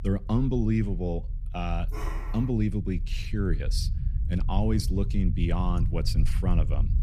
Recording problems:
low rumble; noticeable; throughout; 15 dB below the speech
dog barking; faint; at 2 s; peak 10 dB below the speech

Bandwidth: 14.5 kHz